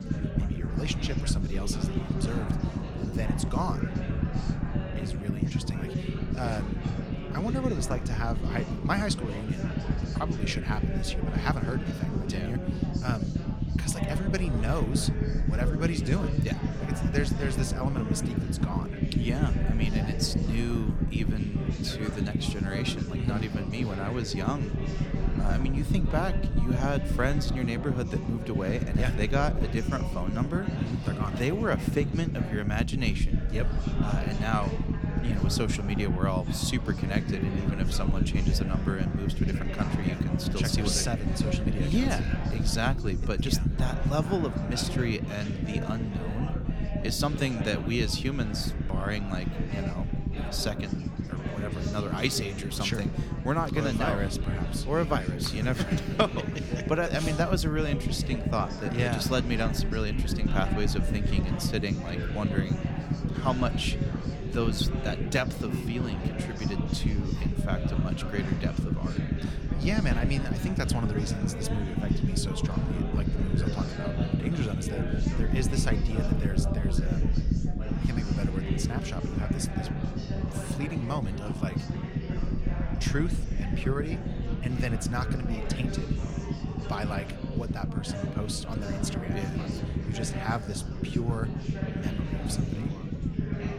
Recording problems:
chatter from many people; loud; throughout; 6 dB below the speech
low rumble; loud; throughout; 6 dB below the speech

